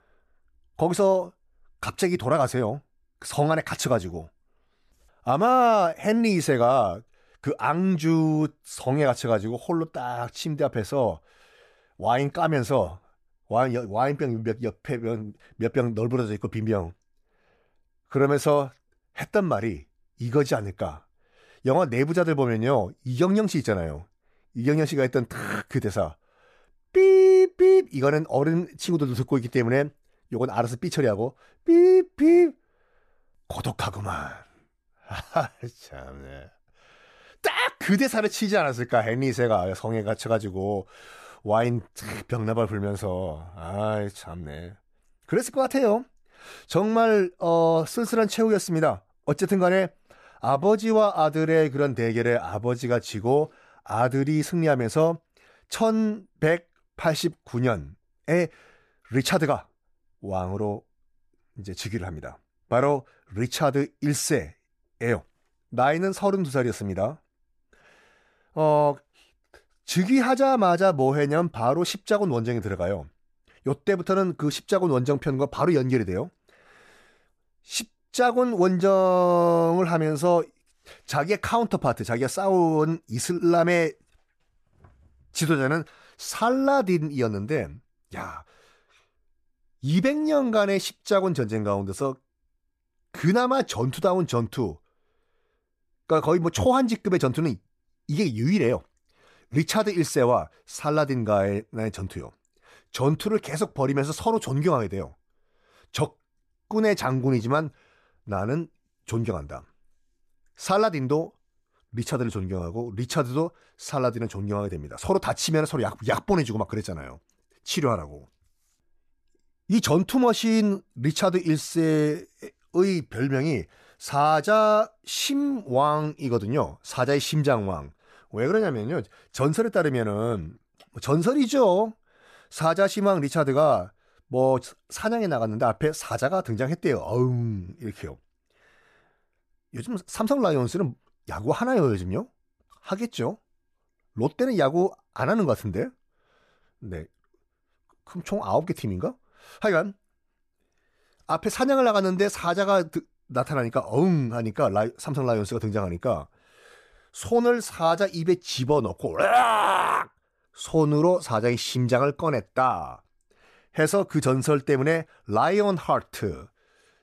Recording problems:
none

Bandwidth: 14.5 kHz